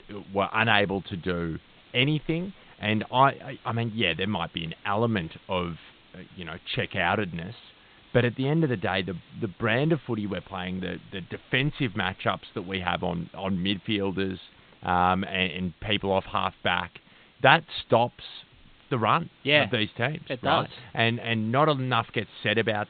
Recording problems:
high frequencies cut off; severe; nothing above 4 kHz
hiss; faint; throughout; 30 dB below the speech

